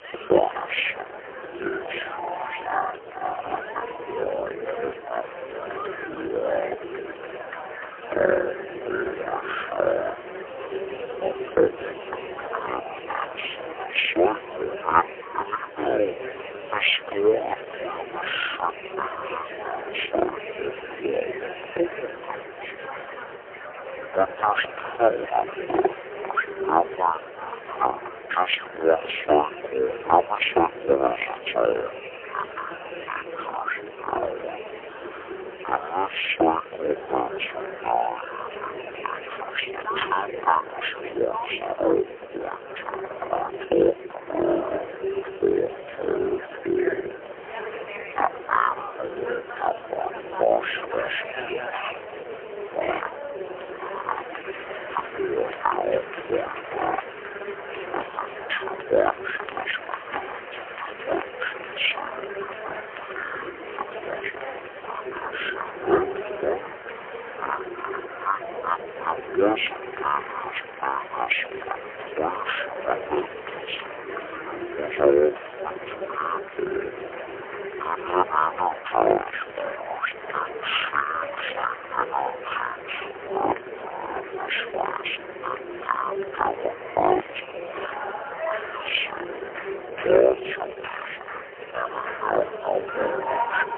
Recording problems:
phone-call audio; poor line; nothing above 3 kHz
wrong speed and pitch; too slow and too low; 0.5 times normal speed
murmuring crowd; loud; throughout; 8 dB below the speech

